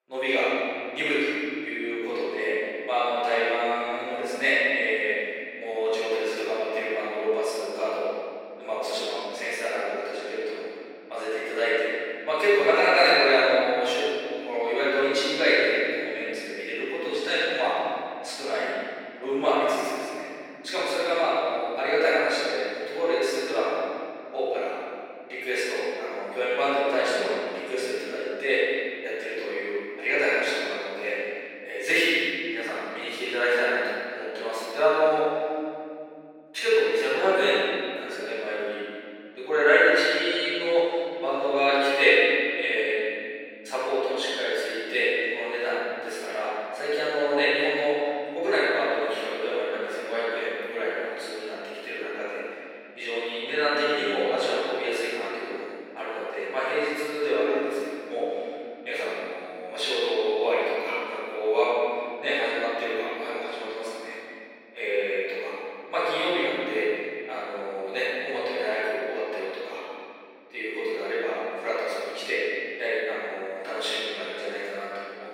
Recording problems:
room echo; strong; dies away in 2.9 s
off-mic speech; far
thin; somewhat; fading below 350 Hz

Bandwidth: 16.5 kHz